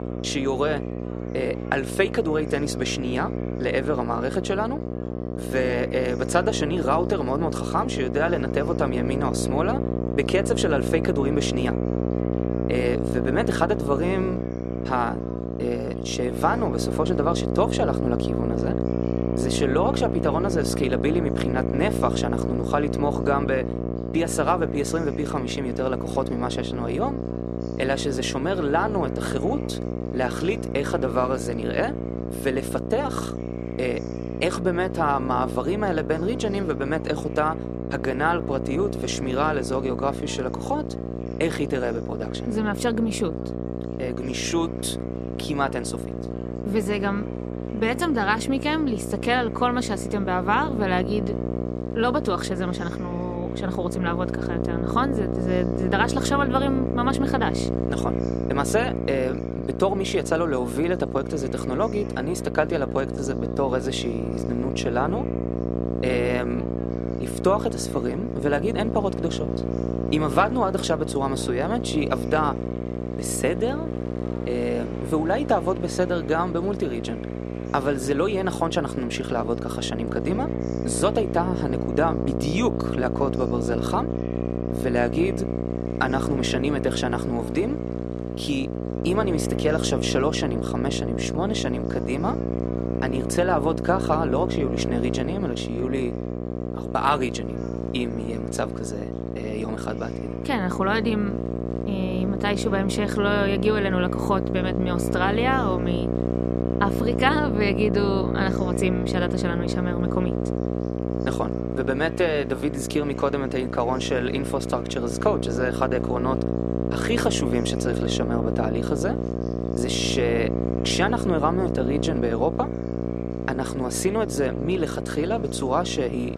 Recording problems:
electrical hum; loud; throughout; 60 Hz, 6 dB below the speech
murmuring crowd; faint; throughout; 25 dB below the speech

